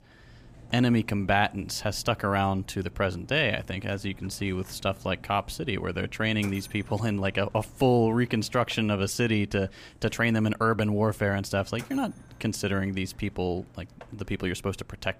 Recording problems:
machinery noise; faint; throughout; 25 dB below the speech

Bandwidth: 15 kHz